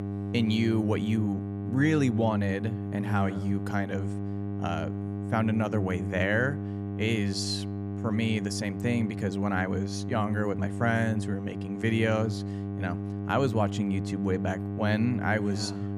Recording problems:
electrical hum; loud; throughout; 50 Hz, 9 dB below the speech

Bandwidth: 14.5 kHz